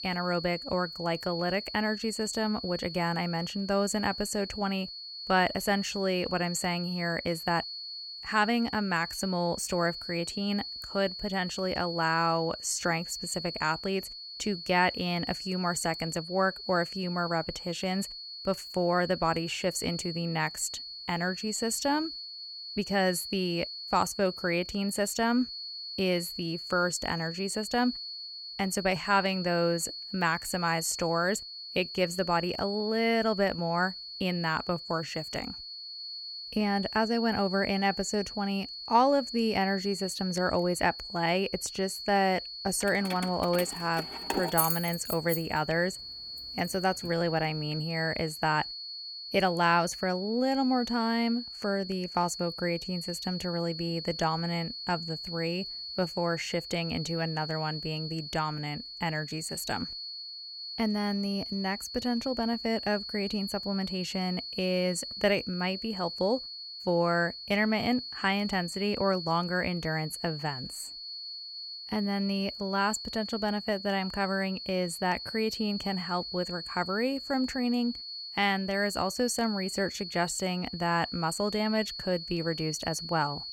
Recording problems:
high-pitched whine; loud; throughout; 4.5 kHz, 8 dB below the speech
jangling keys; loud; from 43 to 45 s; peak 3 dB above the speech

